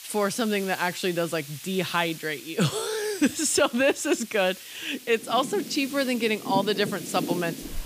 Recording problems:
rain or running water; loud; from 5.5 s on; 10 dB below the speech
hiss; noticeable; throughout; 15 dB below the speech

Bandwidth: 15 kHz